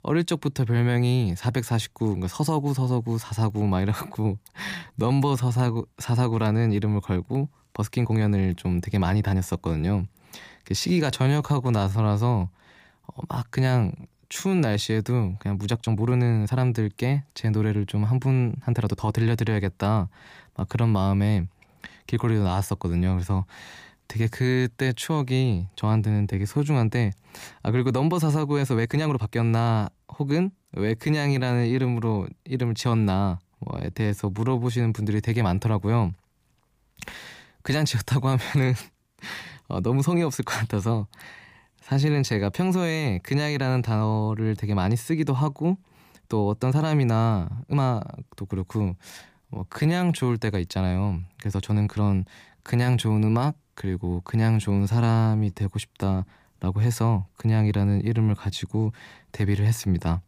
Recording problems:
uneven, jittery; strongly; from 4.5 to 56 s

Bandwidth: 15 kHz